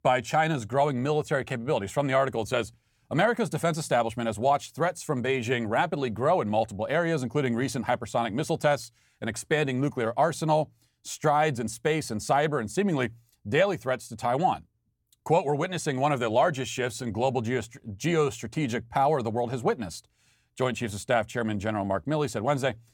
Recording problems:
none

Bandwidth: 17.5 kHz